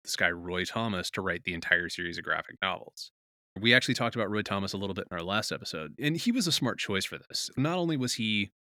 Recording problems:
none

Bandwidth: 18.5 kHz